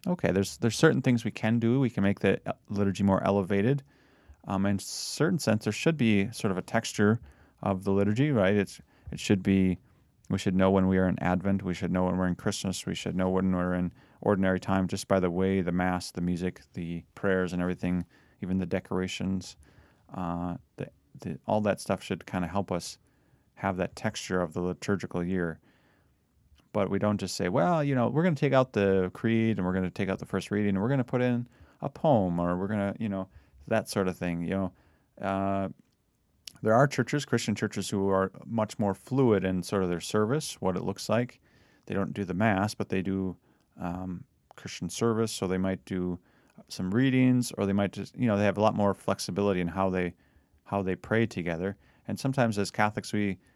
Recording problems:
none

